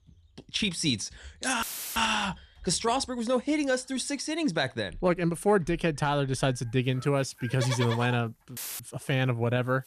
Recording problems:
animal sounds; noticeable; throughout; 15 dB below the speech
audio cutting out; filled with static; at 1.5 s and at 8.5 s

